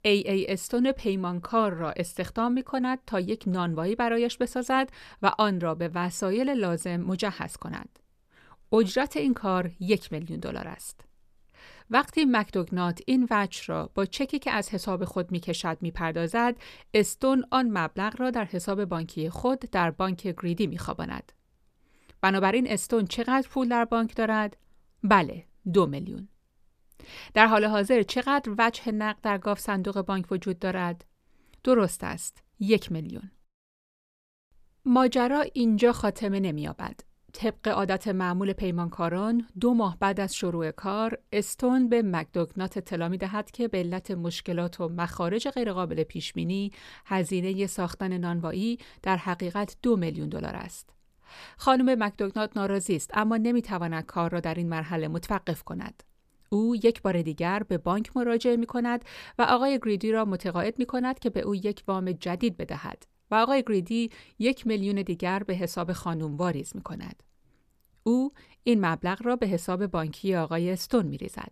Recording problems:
none

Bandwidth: 14.5 kHz